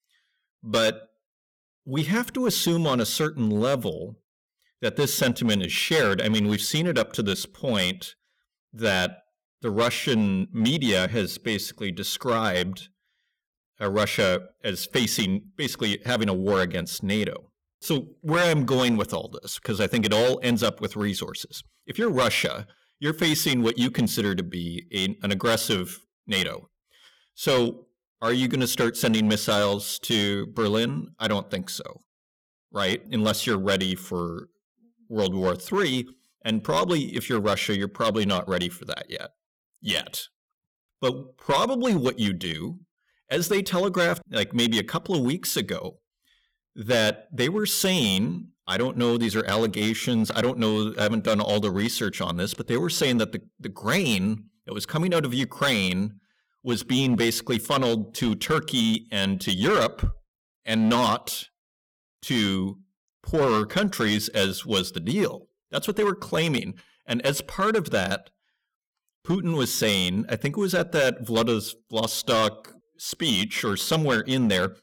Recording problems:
distortion; slight; 6% of the sound clipped

